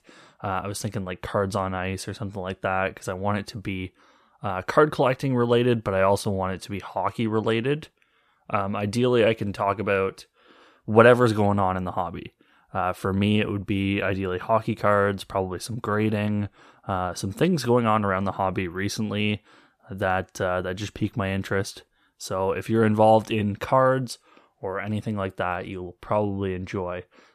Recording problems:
none

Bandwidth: 14.5 kHz